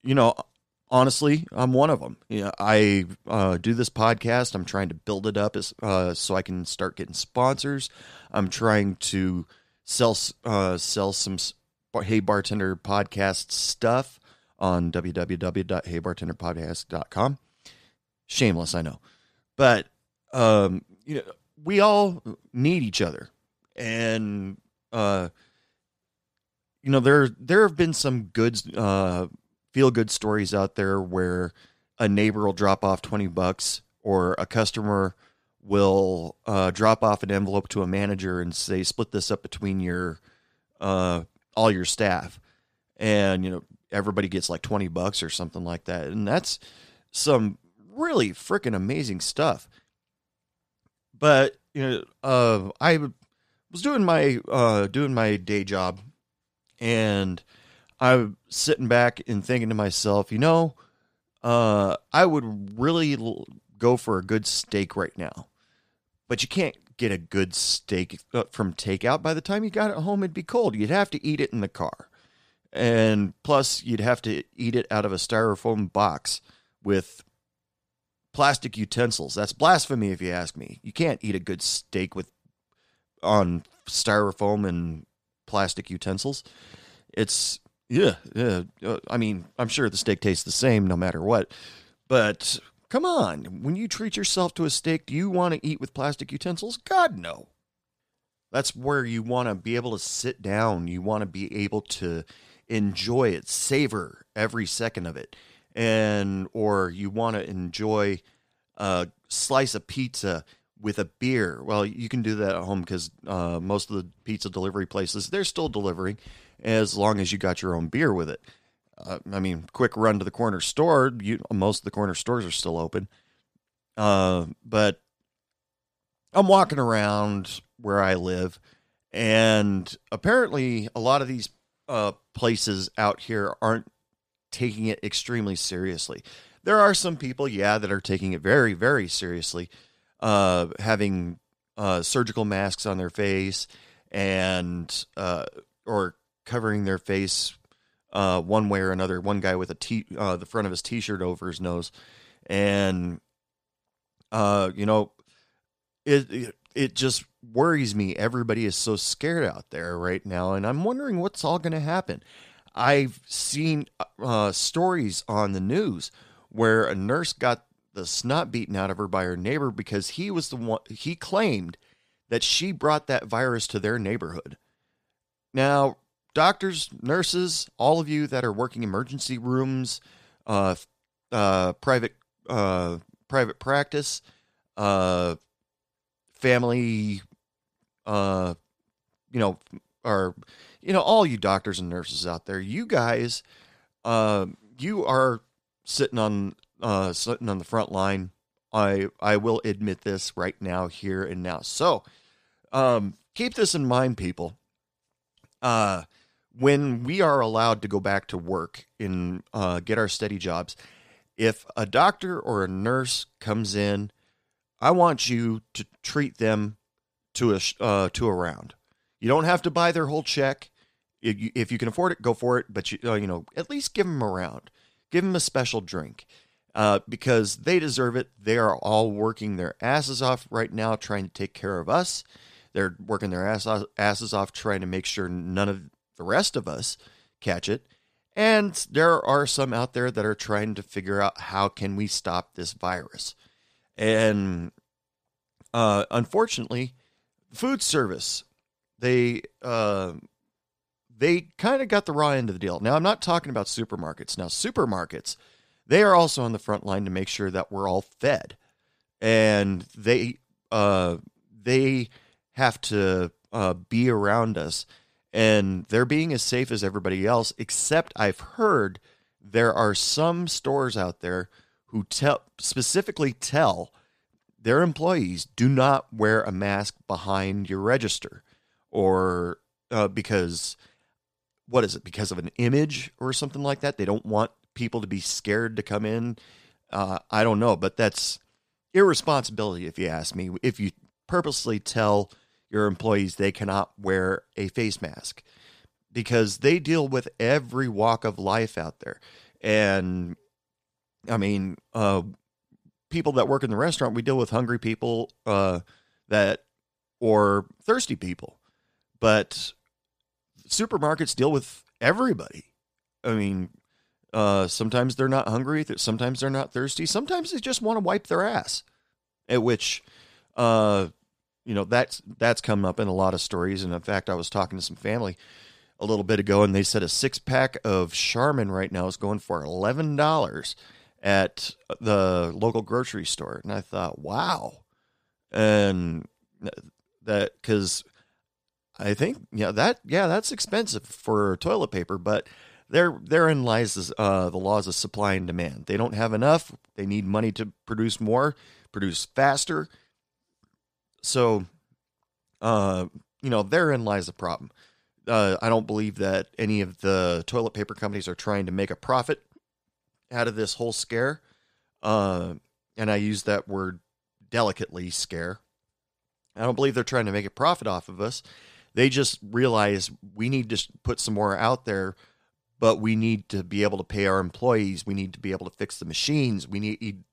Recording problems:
none

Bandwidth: 14.5 kHz